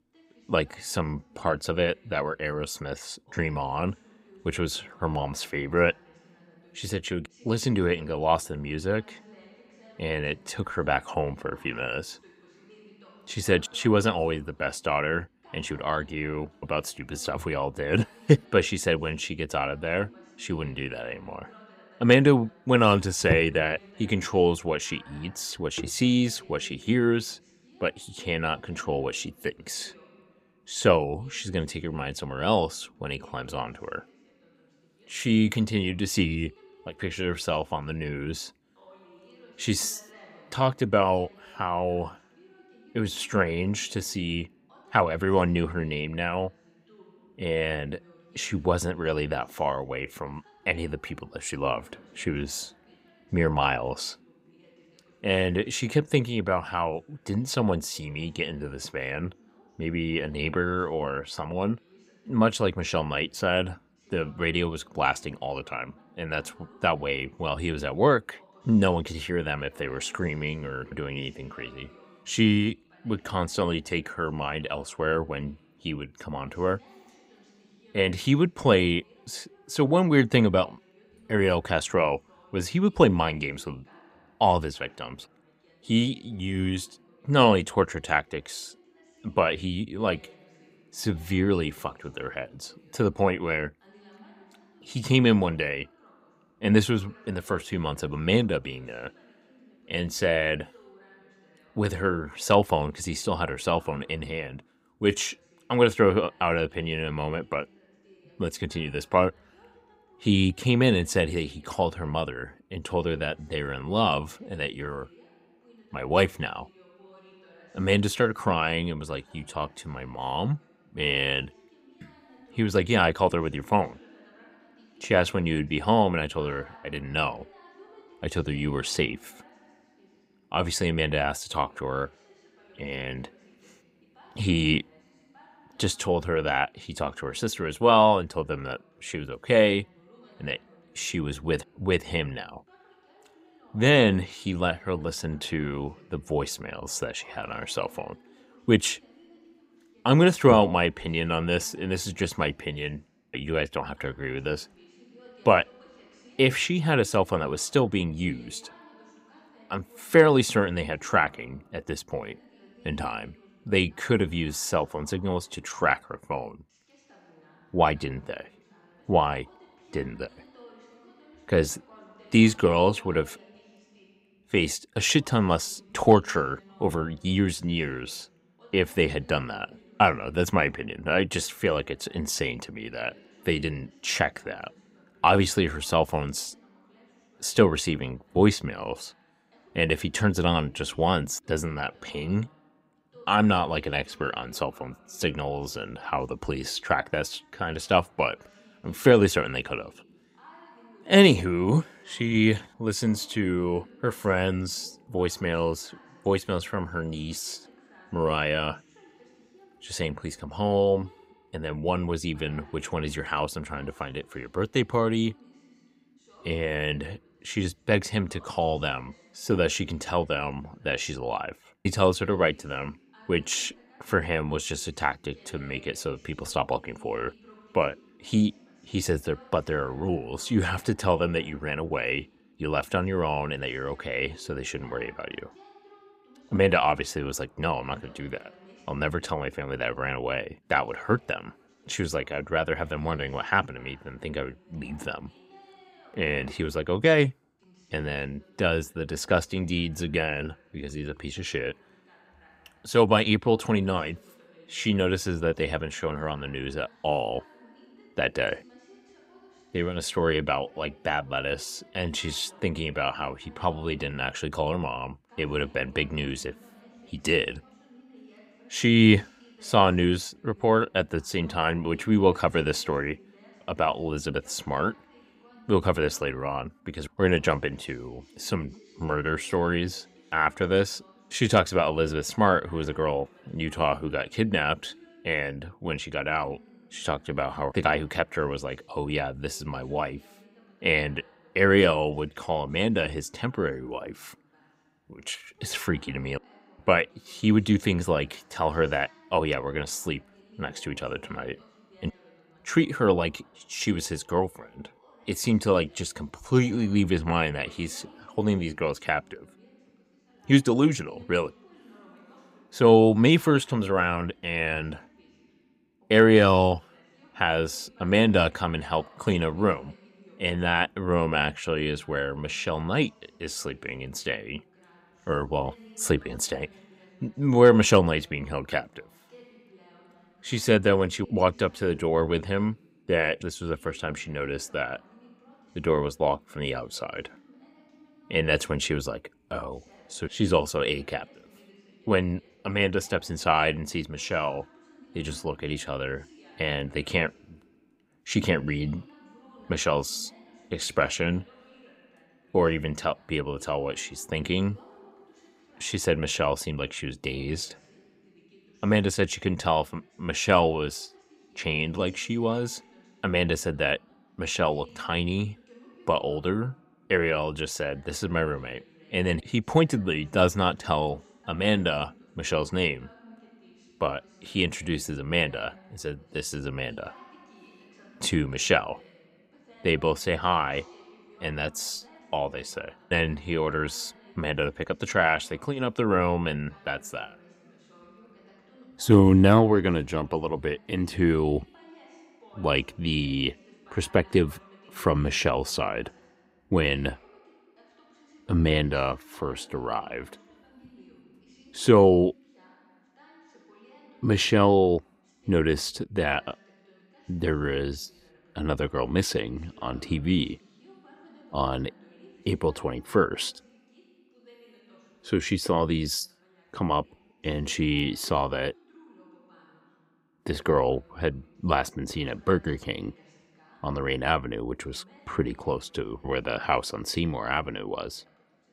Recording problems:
voice in the background; faint; throughout; 30 dB below the speech

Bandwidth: 15.5 kHz